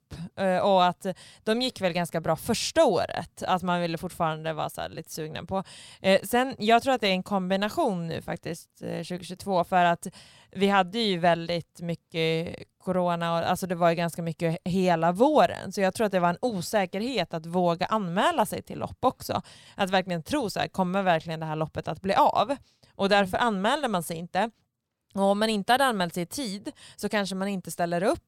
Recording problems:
none

